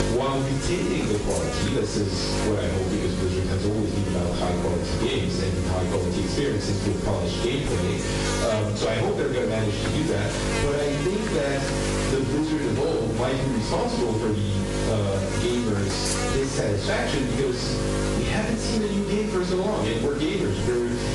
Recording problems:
off-mic speech; far
room echo; noticeable; dies away in 0.5 s
distortion; slight; 10 dB below the speech
garbled, watery; slightly; nothing above 10 kHz
squashed, flat; somewhat
electrical hum; loud; throughout; 50 Hz, 4 dB below the speech

